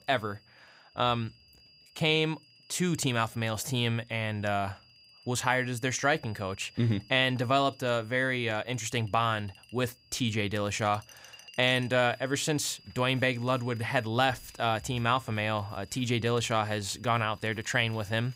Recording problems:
high-pitched whine; faint; throughout; 5 kHz, 25 dB below the speech
household noises; faint; throughout; 30 dB below the speech

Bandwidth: 15.5 kHz